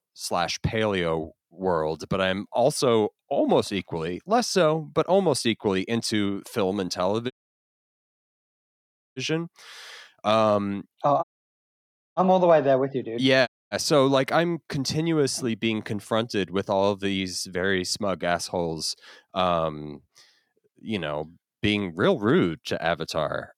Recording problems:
audio cutting out; at 7.5 s for 2 s, at 11 s for 1 s and at 13 s

